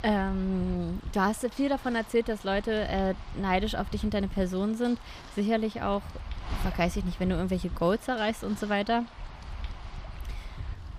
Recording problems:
wind noise on the microphone; occasional gusts; 15 dB below the speech

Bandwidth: 15 kHz